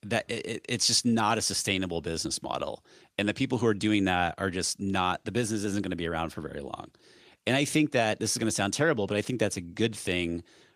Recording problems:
none

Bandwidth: 15 kHz